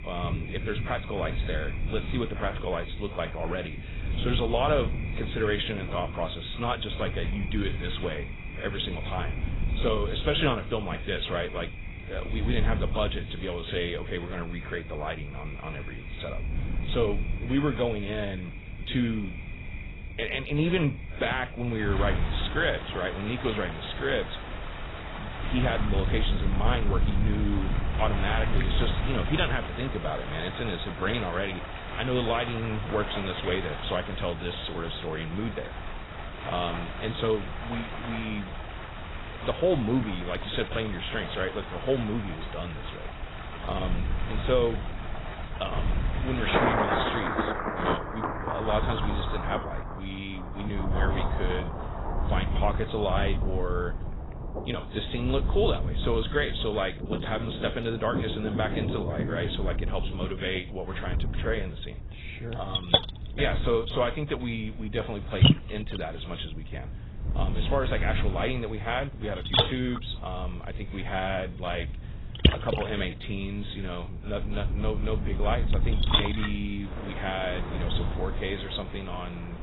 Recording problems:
garbled, watery; badly; nothing above 4 kHz
rain or running water; loud; throughout; 4 dB below the speech
wind noise on the microphone; occasional gusts; 15 dB below the speech

